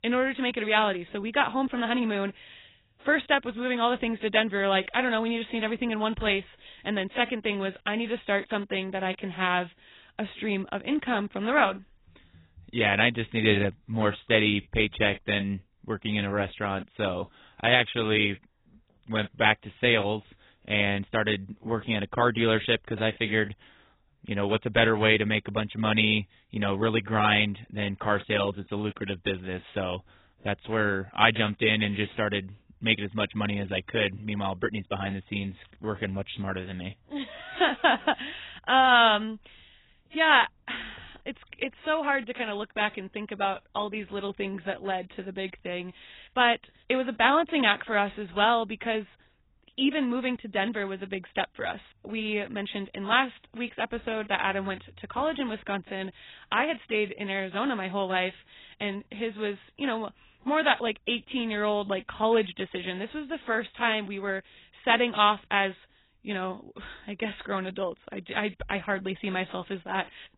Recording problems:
garbled, watery; badly; nothing above 4 kHz

